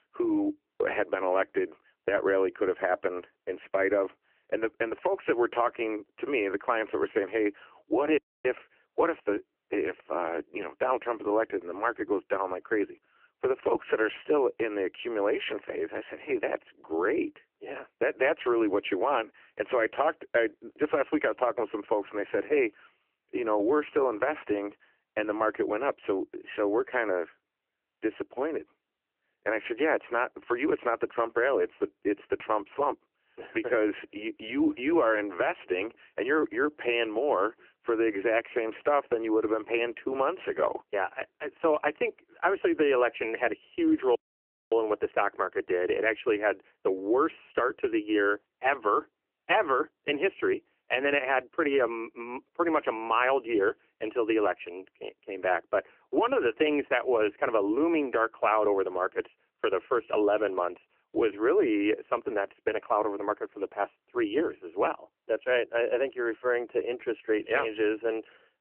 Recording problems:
phone-call audio; nothing above 3 kHz
audio cutting out; at 8 s and at 44 s for 0.5 s

